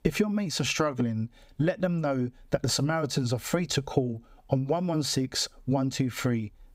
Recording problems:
squashed, flat; somewhat

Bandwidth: 15.5 kHz